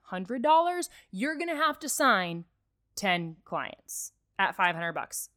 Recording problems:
none

